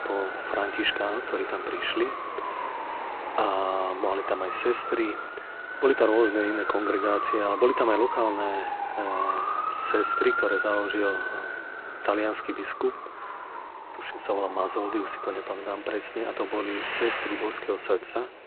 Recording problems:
phone-call audio; poor line
traffic noise; loud; throughout; 4 dB below the speech

